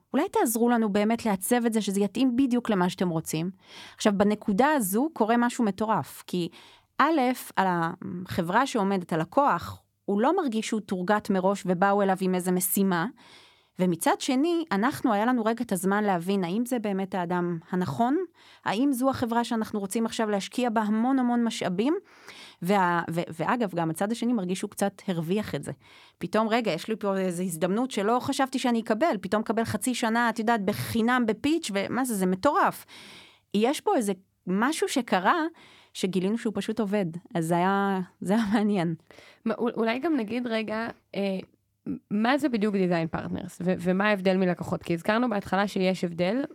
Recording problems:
none

